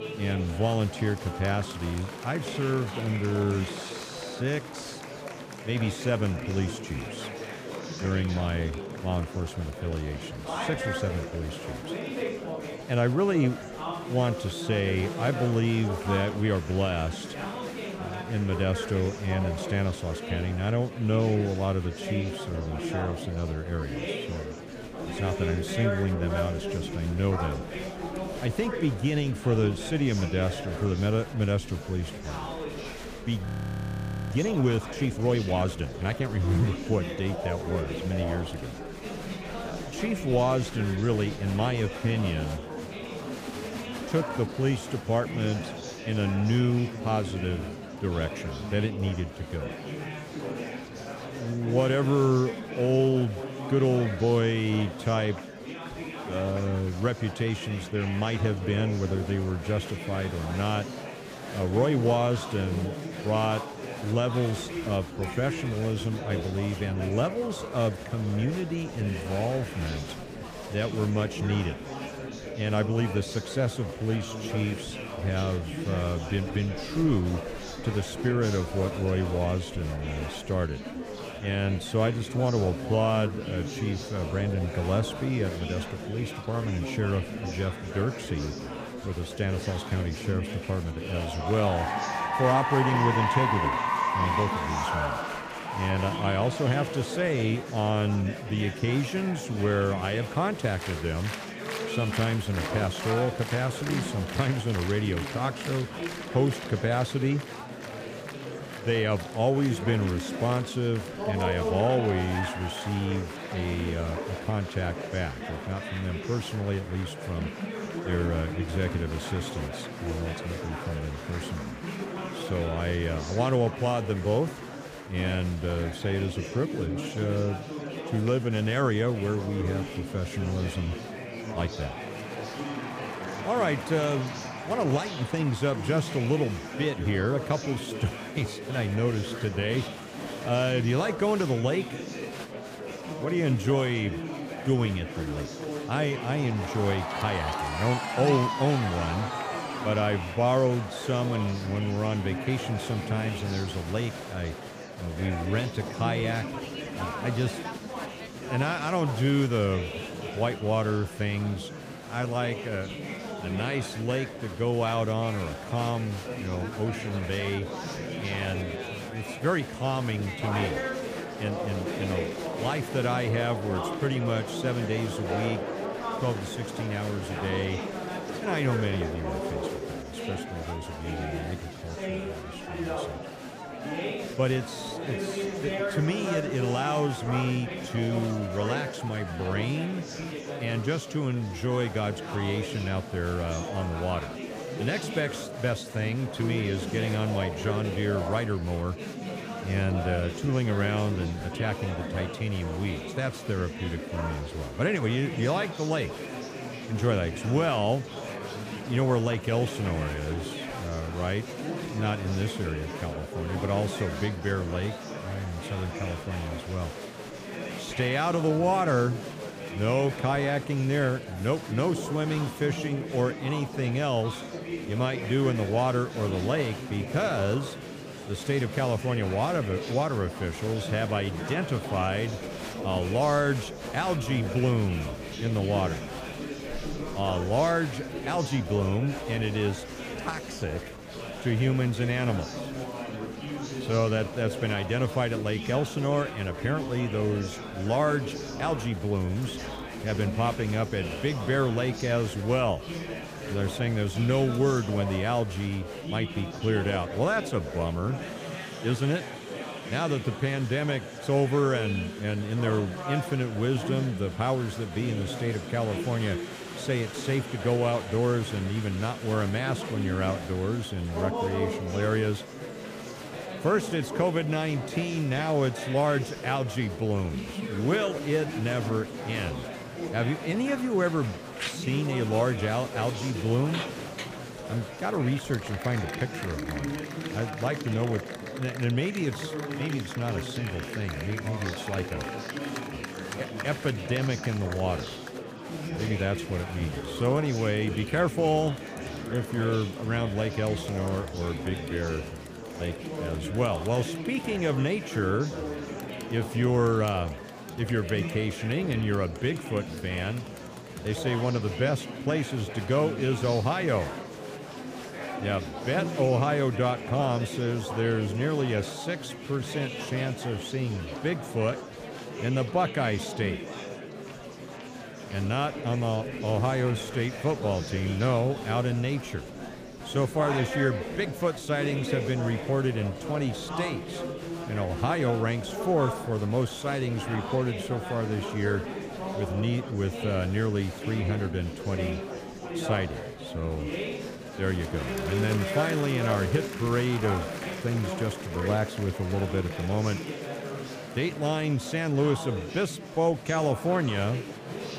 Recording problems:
murmuring crowd; loud; throughout; 6 dB below the speech
audio freezing; at 33 s for 1 s

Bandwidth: 15 kHz